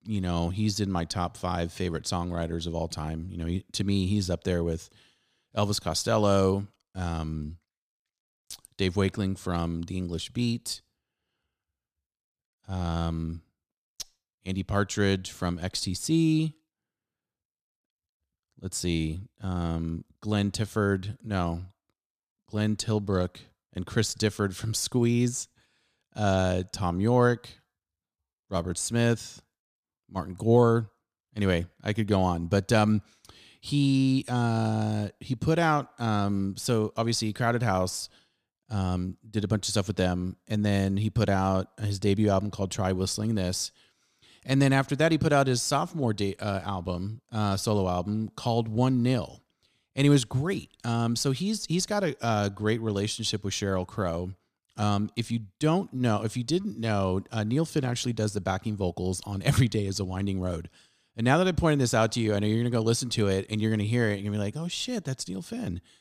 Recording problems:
none

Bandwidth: 15 kHz